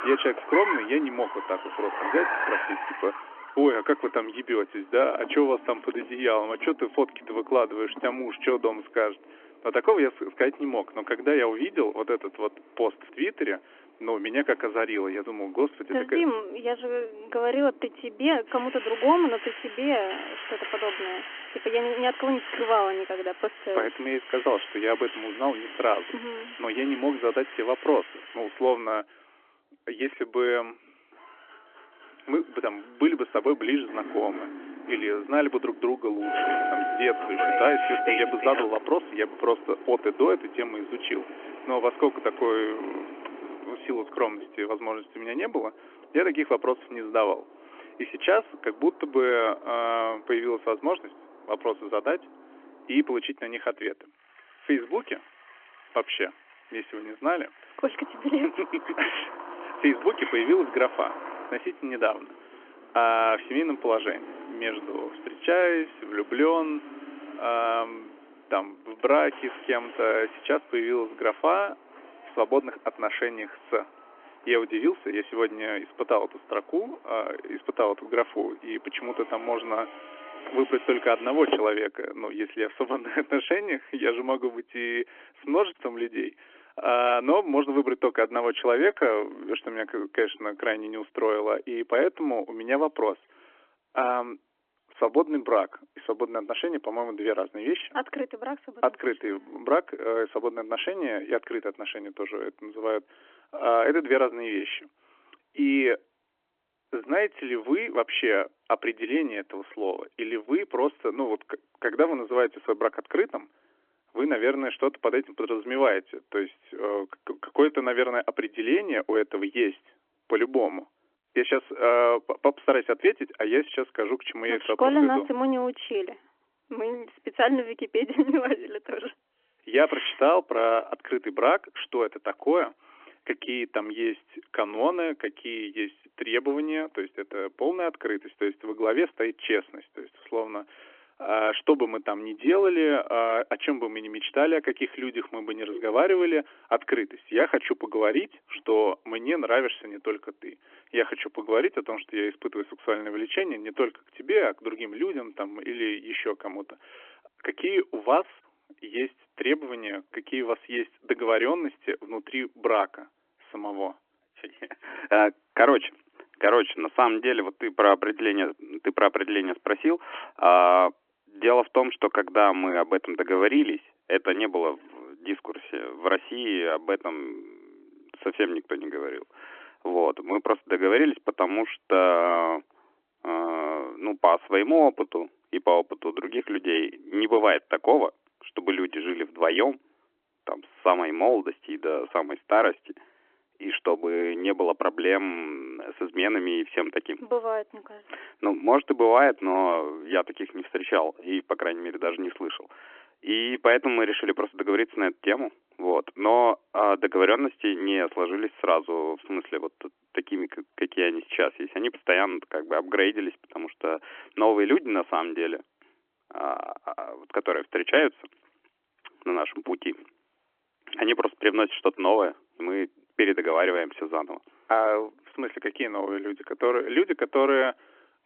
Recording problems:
phone-call audio; nothing above 3.5 kHz
traffic noise; loud; until 1:22; 9 dB below the speech

